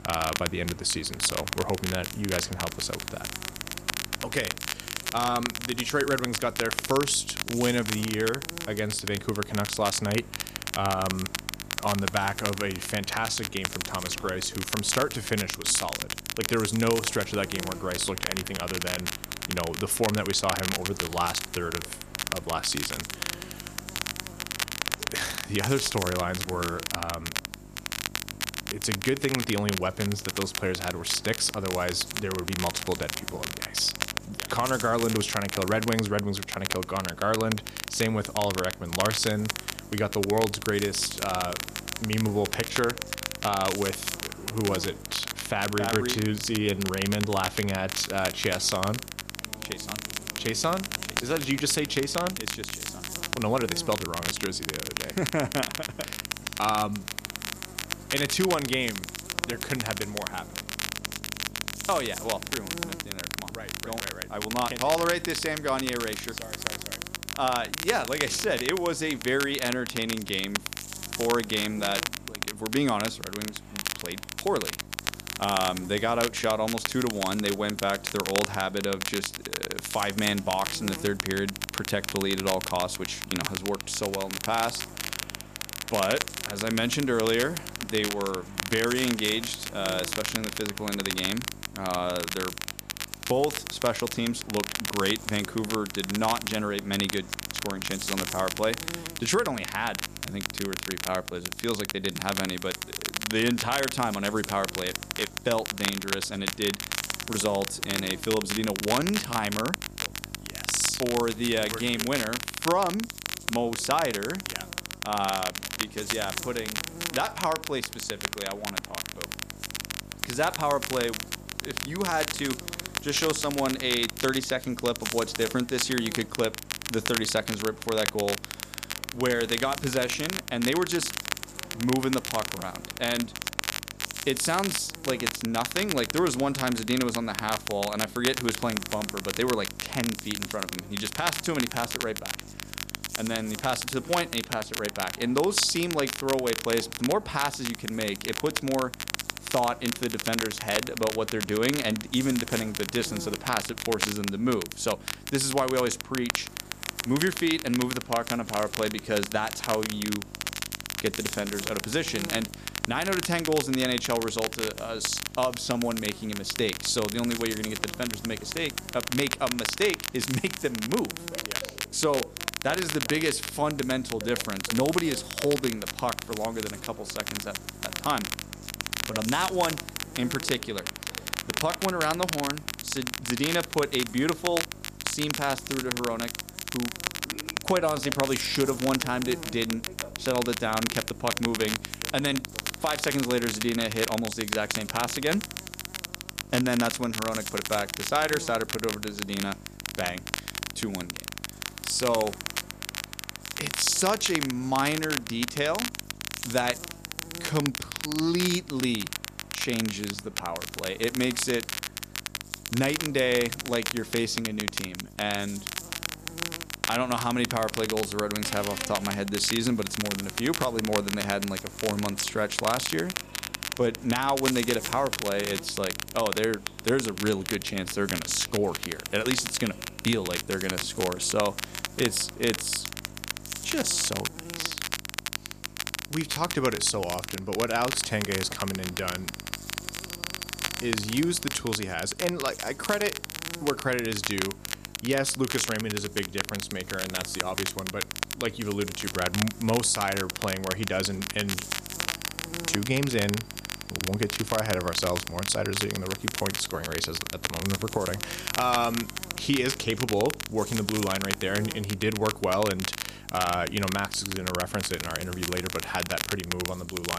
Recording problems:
crackle, like an old record; loud; 4 dB below the speech
electrical hum; noticeable; throughout; 50 Hz, 20 dB below the speech
train or aircraft noise; faint; throughout; 25 dB below the speech
abrupt cut into speech; at the end

